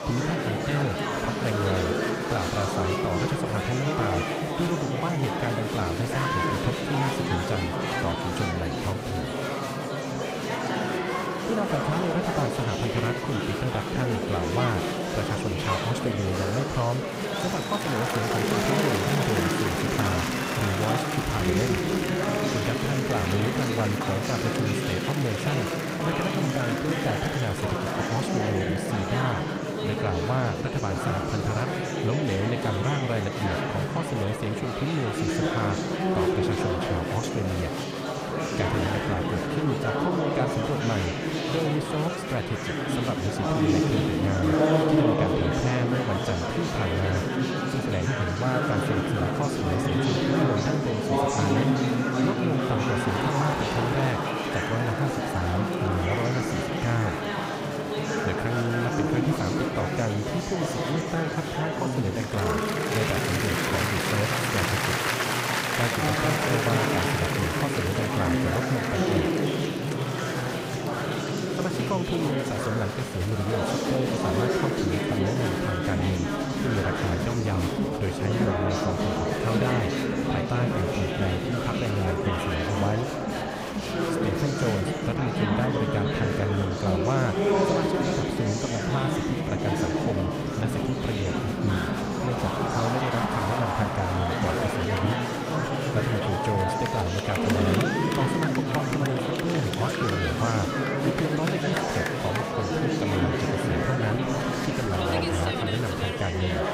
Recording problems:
murmuring crowd; very loud; throughout; 3 dB above the speech

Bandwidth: 15.5 kHz